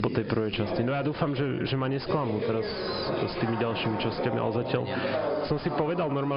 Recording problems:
high frequencies cut off; noticeable; nothing above 5 kHz
distortion; slight; 9 dB below the speech
squashed, flat; somewhat
background chatter; loud; throughout; 3 voices, 3 dB below the speech
abrupt cut into speech; at the end

